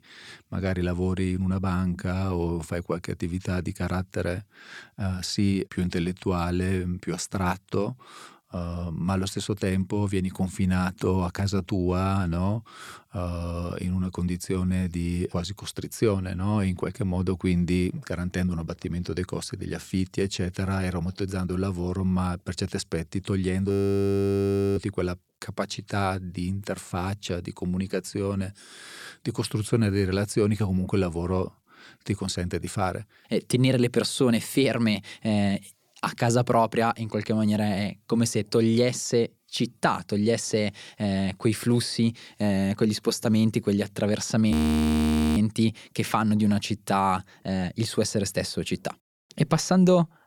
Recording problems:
audio freezing; at 24 s for 1 s and at 45 s for 1 s

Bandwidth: 18.5 kHz